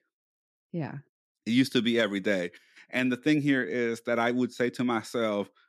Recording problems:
none

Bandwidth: 13.5 kHz